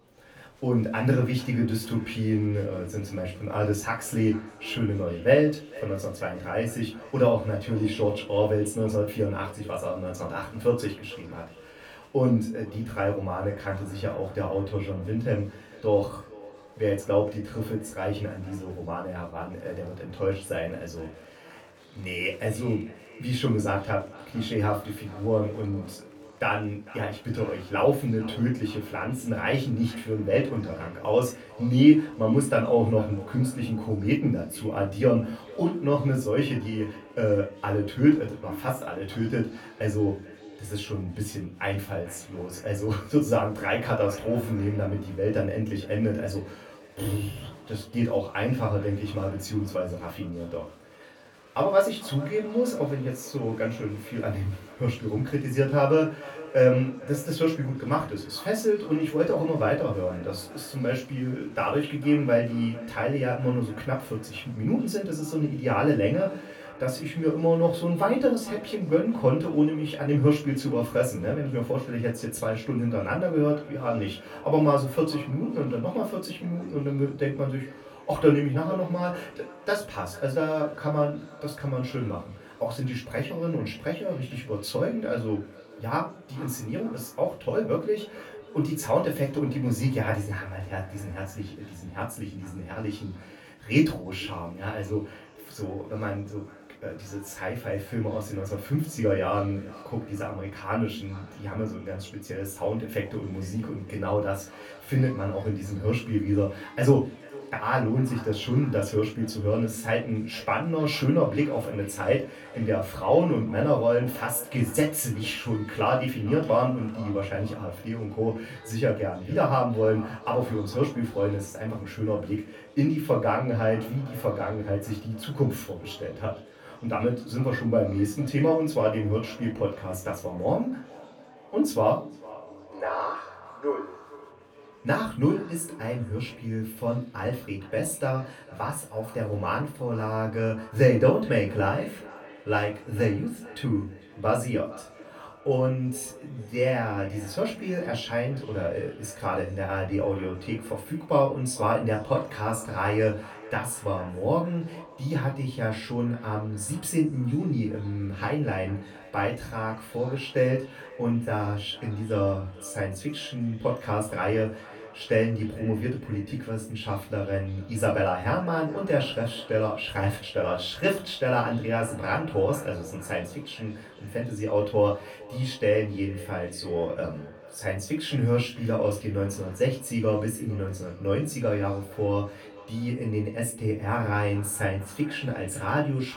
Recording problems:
off-mic speech; far
echo of what is said; faint; throughout; 450 ms later, 20 dB below the speech
room echo; very slight; dies away in 0.3 s
murmuring crowd; faint; throughout; 30 dB below the speech

